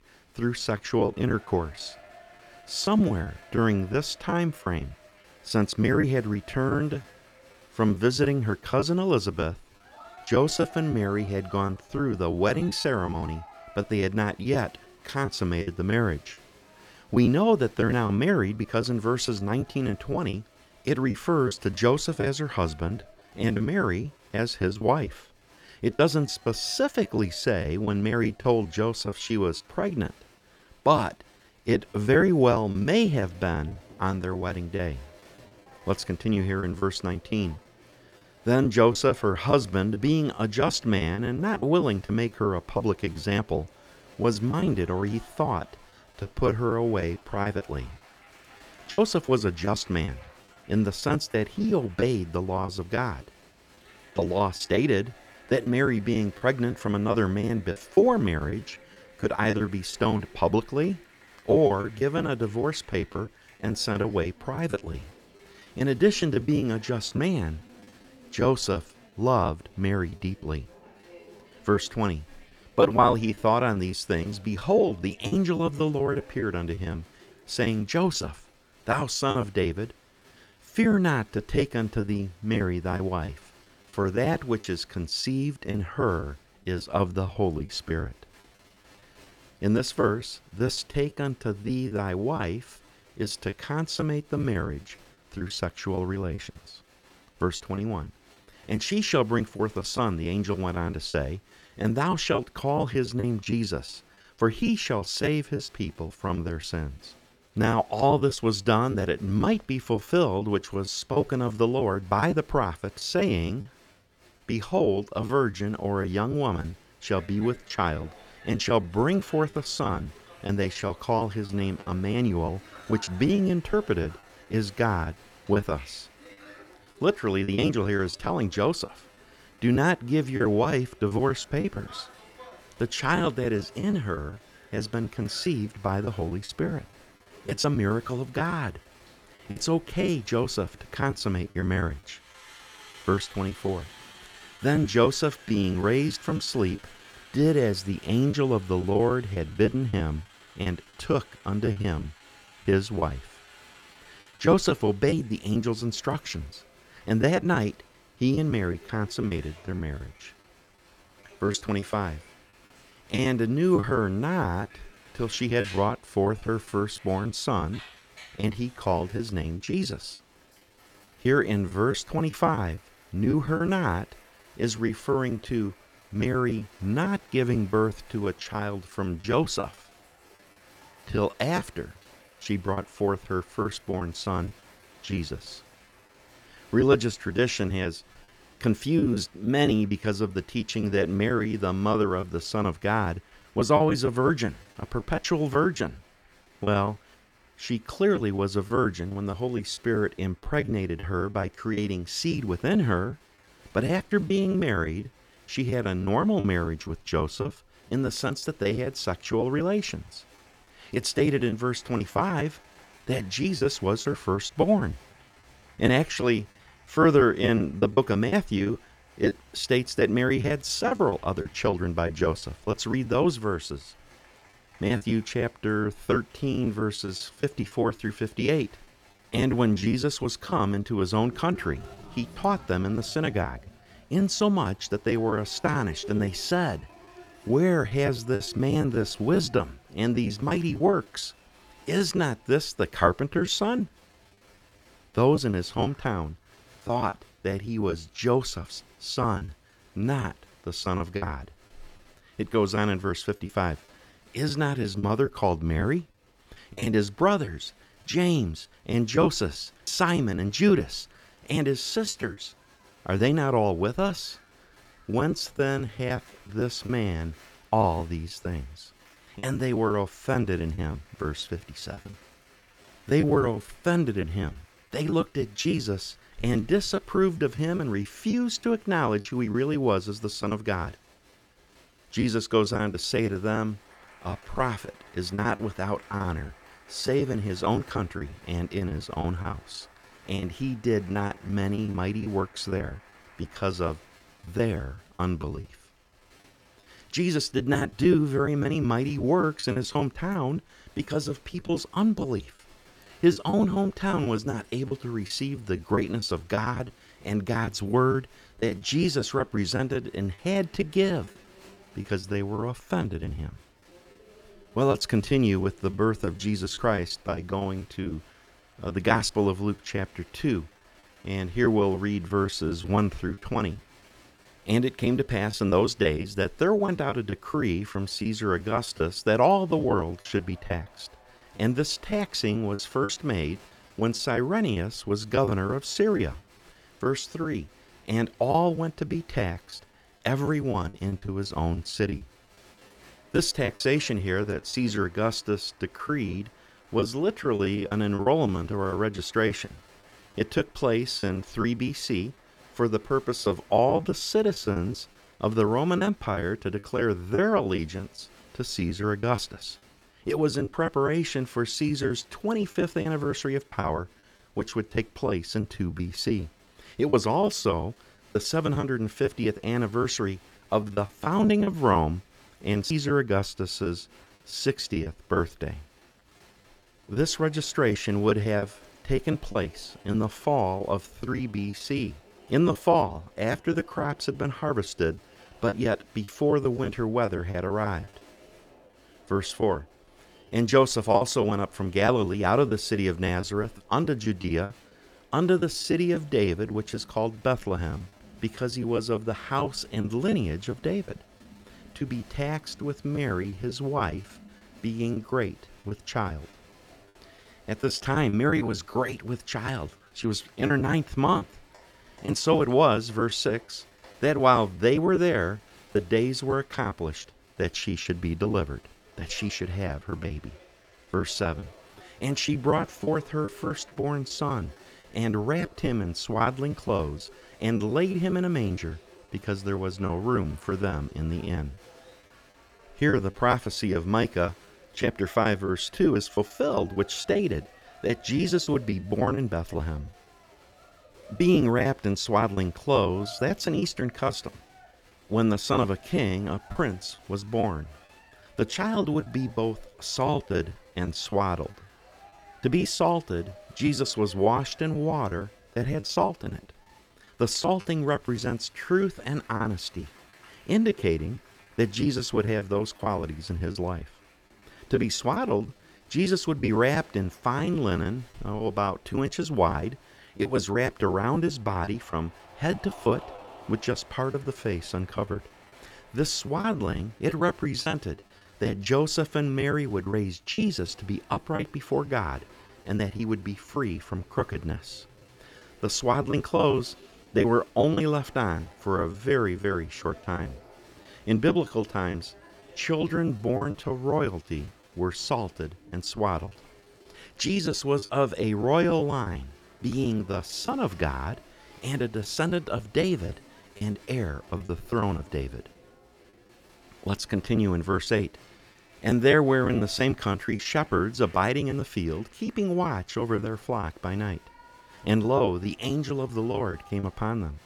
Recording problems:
crowd noise; faint; throughout; 25 dB below the speech
choppy; very; 10% of the speech affected

